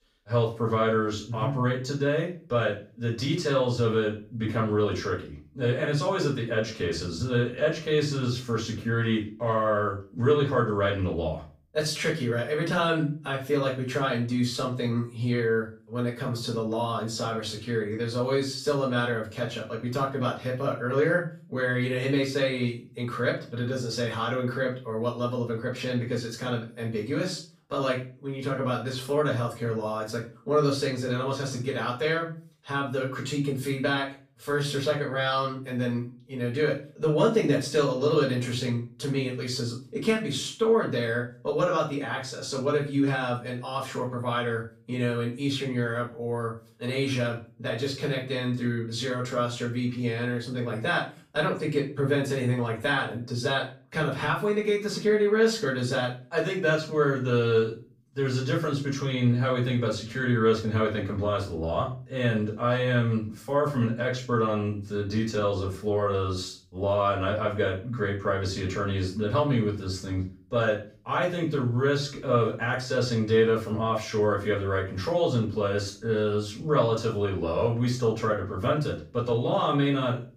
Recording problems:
off-mic speech; far
room echo; slight; dies away in 0.3 s

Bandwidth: 15.5 kHz